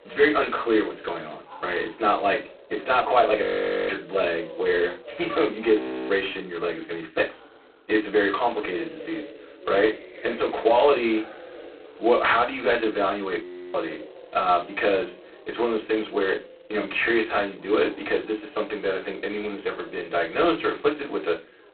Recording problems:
phone-call audio; poor line; nothing above 4 kHz
off-mic speech; far
room echo; very slight; dies away in 0.2 s
background chatter; noticeable; throughout; 3 voices, 20 dB below the speech
audio freezing; at 3.5 s, at 6 s and at 13 s

